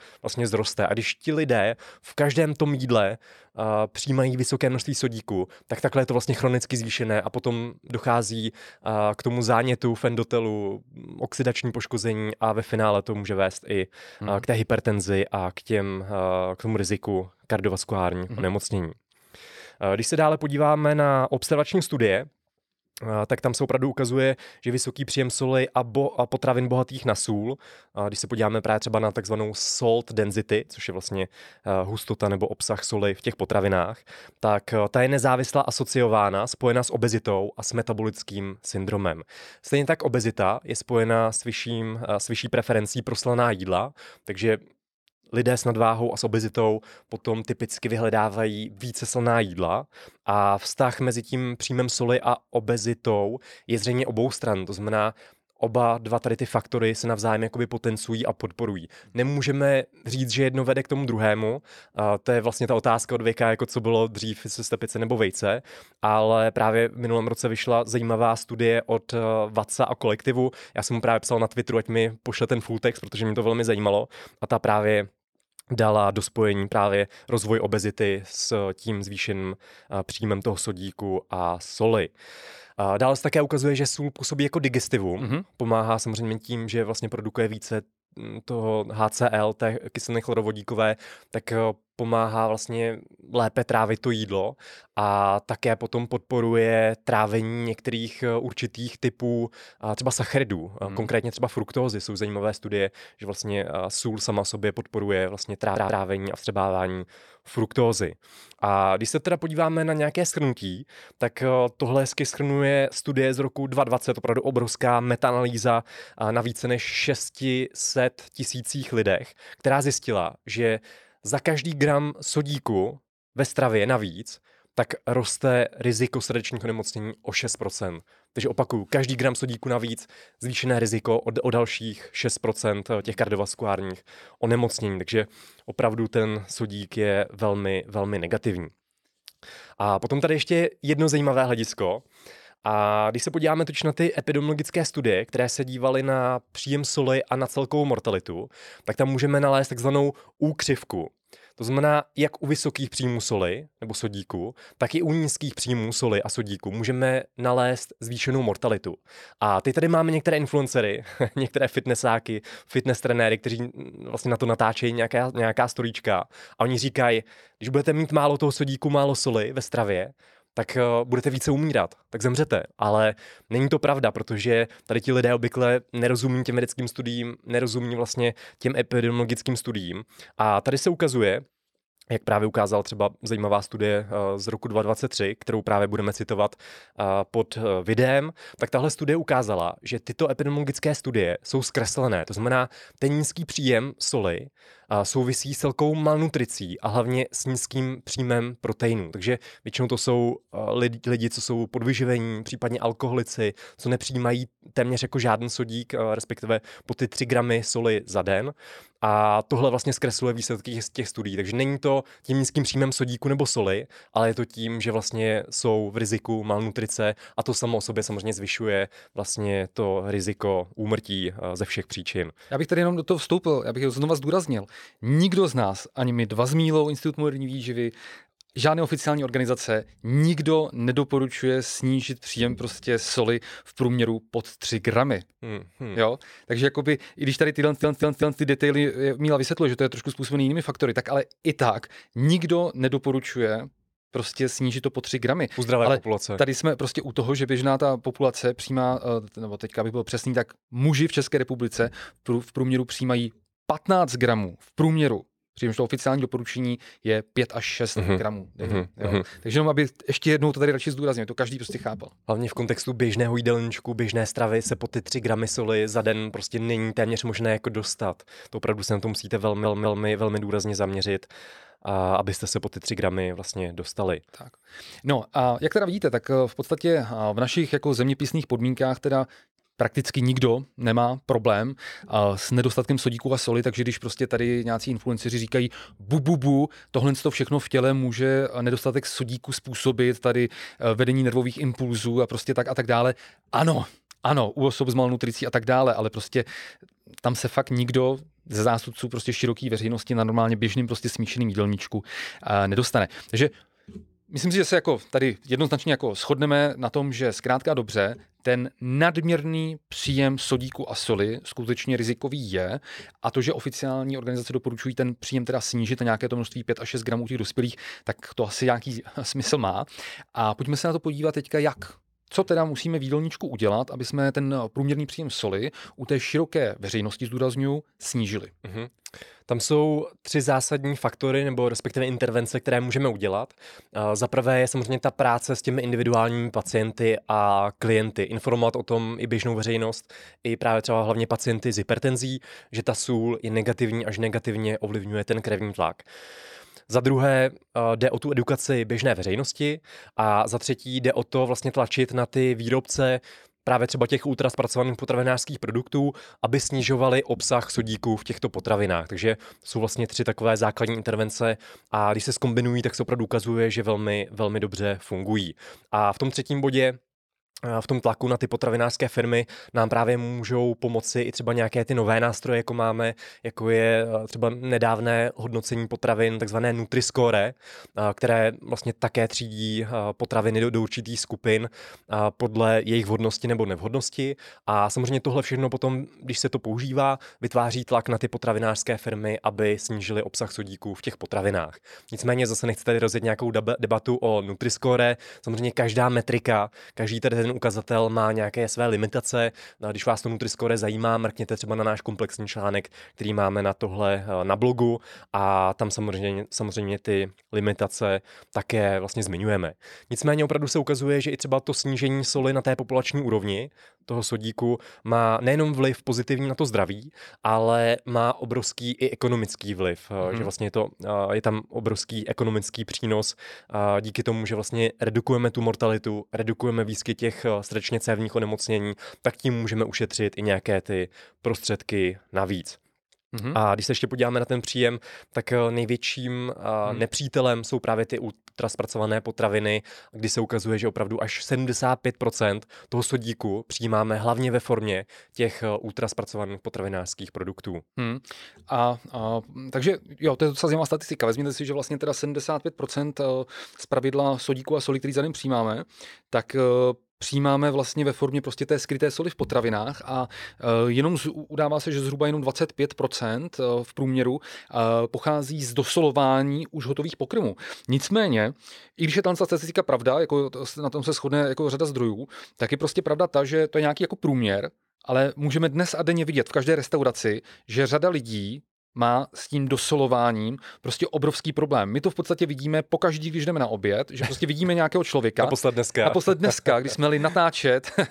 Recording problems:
audio stuttering; 4 times, first at 1:46

